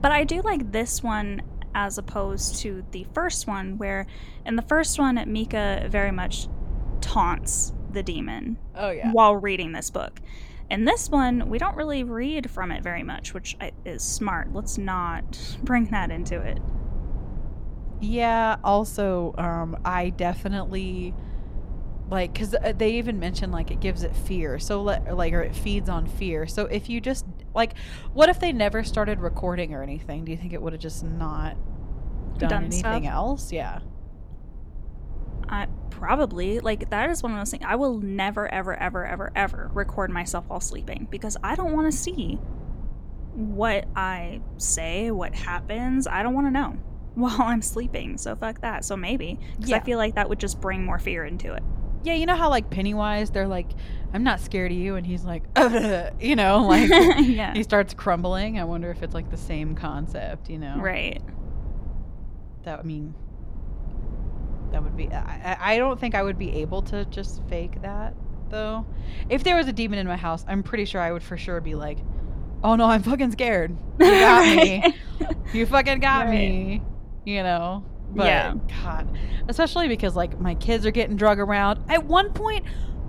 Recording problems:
low rumble; faint; throughout; 25 dB below the speech

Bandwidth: 18 kHz